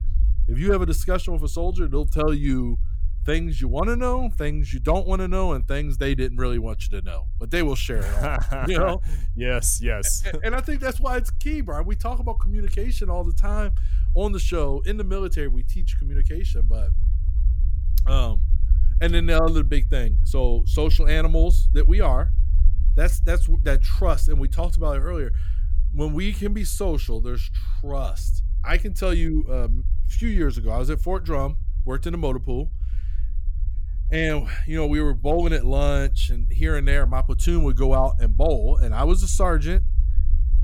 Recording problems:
low rumble; noticeable; throughout; 20 dB below the speech

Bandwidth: 17 kHz